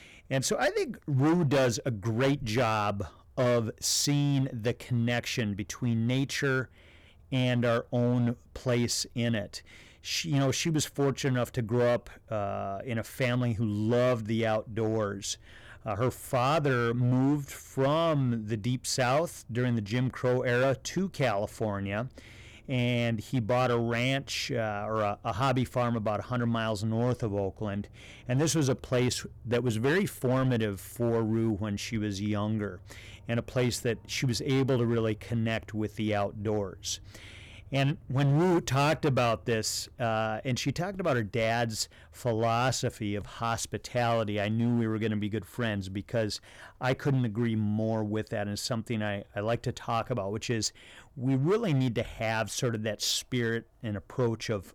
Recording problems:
distortion; slight; 7% of the sound clipped

